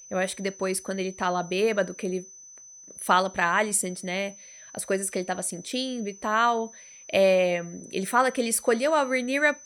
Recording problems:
high-pitched whine; noticeable; throughout; 6 kHz, 20 dB below the speech

